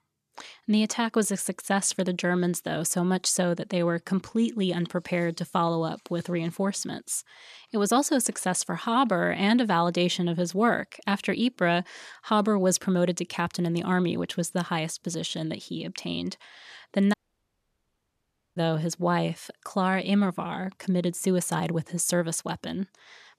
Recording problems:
audio cutting out; at 17 s for 1.5 s

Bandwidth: 13.5 kHz